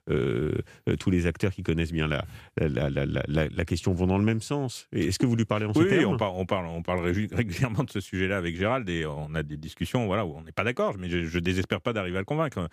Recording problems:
none

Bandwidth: 15 kHz